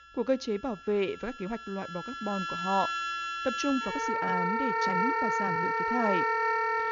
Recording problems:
high frequencies cut off; noticeable; nothing above 7 kHz
background music; very loud; throughout; 4 dB above the speech
uneven, jittery; strongly; from 1 to 6 s

